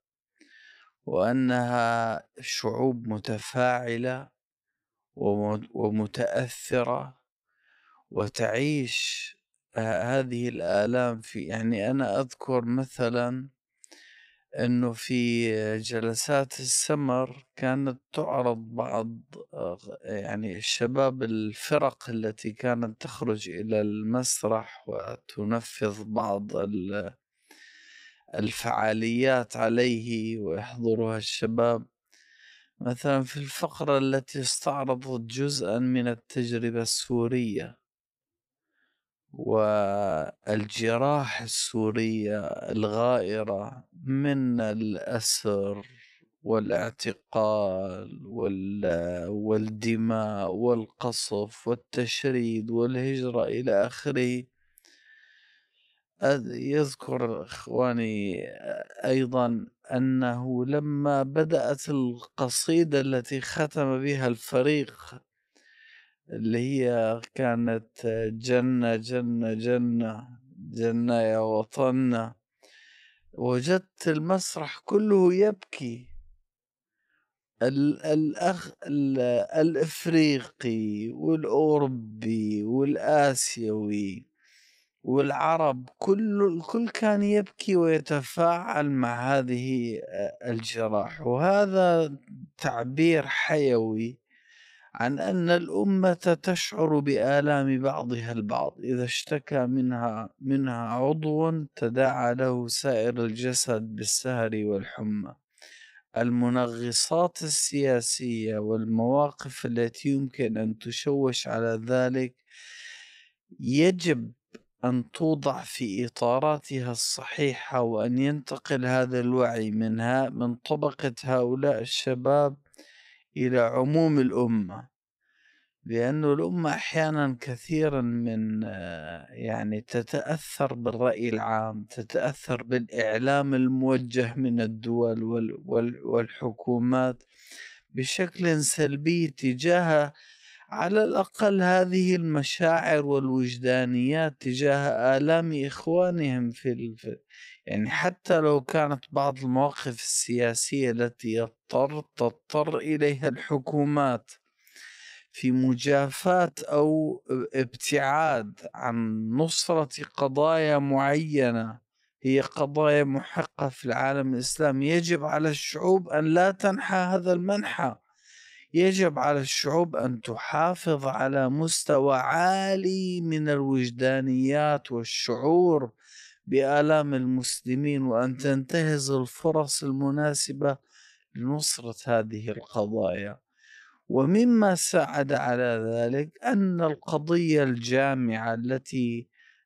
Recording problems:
wrong speed, natural pitch; too slow; 0.6 times normal speed

